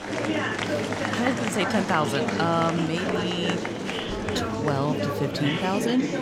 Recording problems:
murmuring crowd; loud; throughout; as loud as the speech

